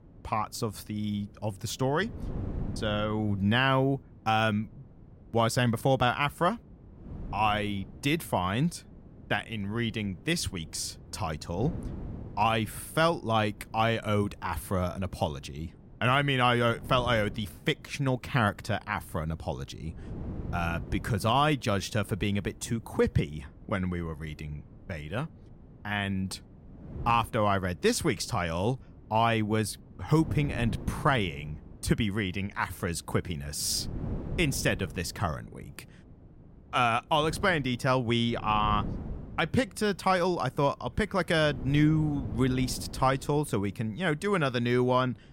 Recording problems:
wind noise on the microphone; occasional gusts; 25 dB below the speech

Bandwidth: 16 kHz